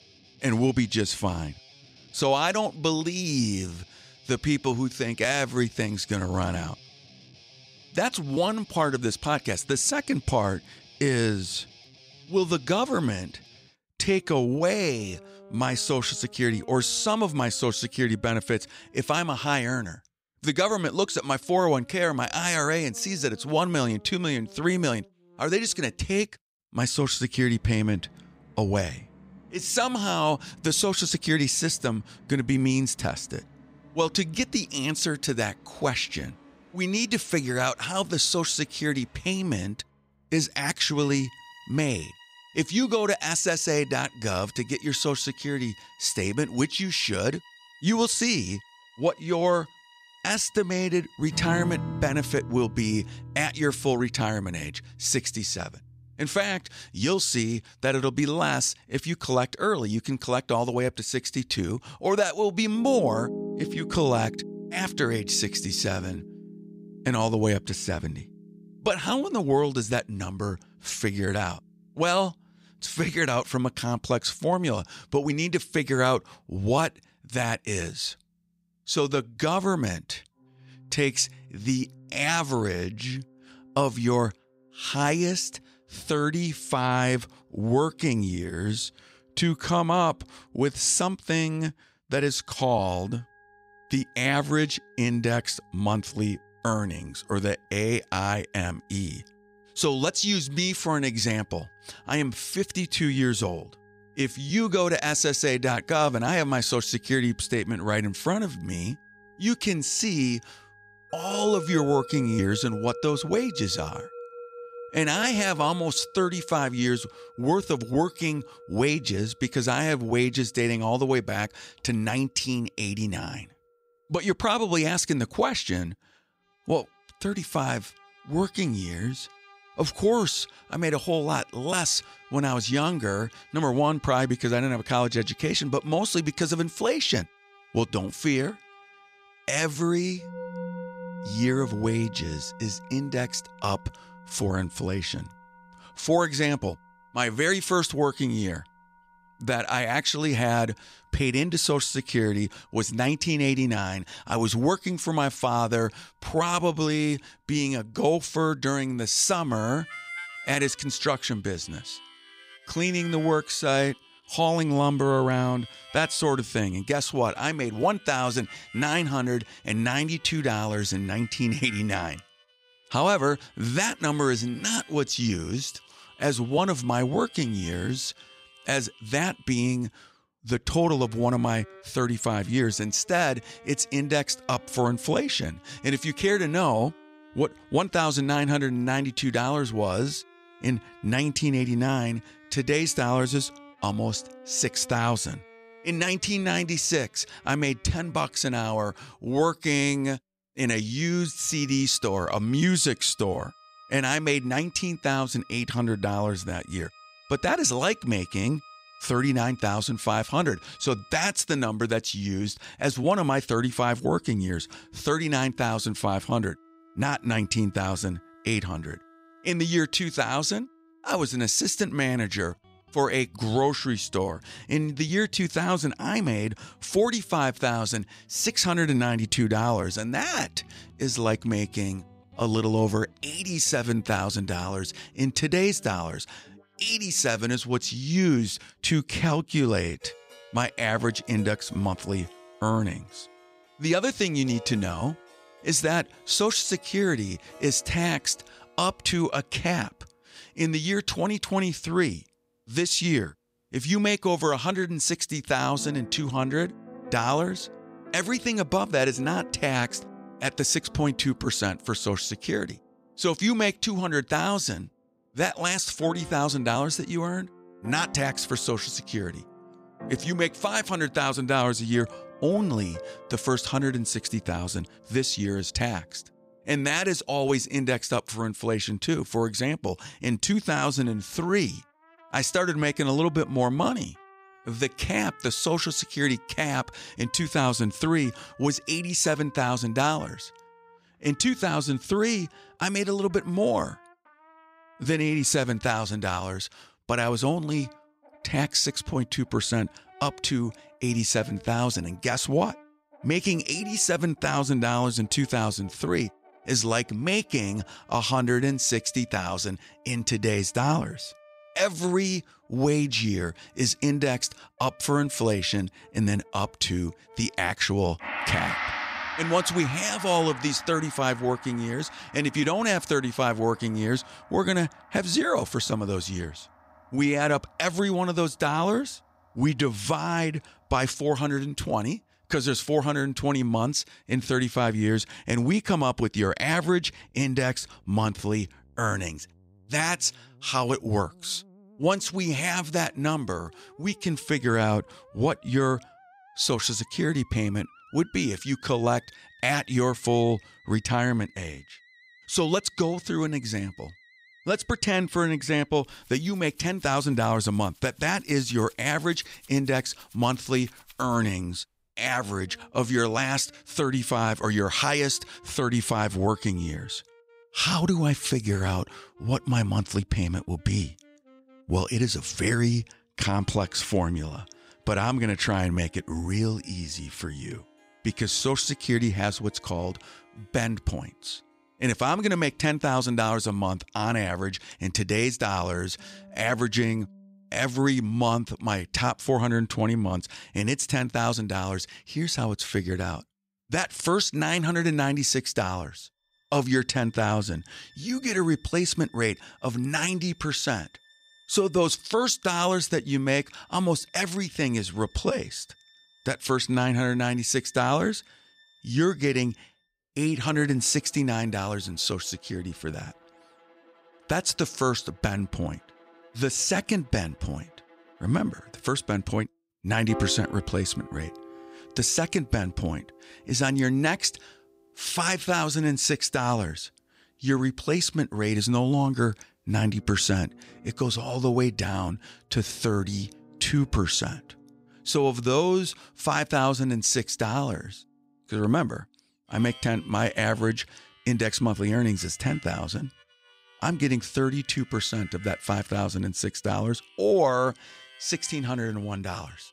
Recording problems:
background music; noticeable; throughout; 20 dB below the speech

